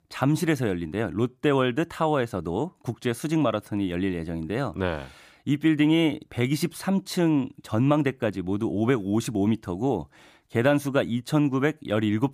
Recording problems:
none

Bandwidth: 15 kHz